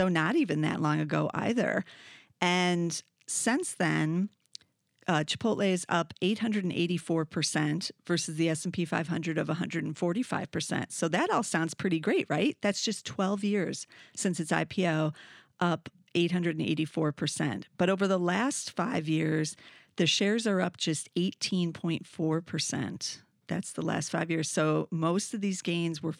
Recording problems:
abrupt cut into speech; at the start

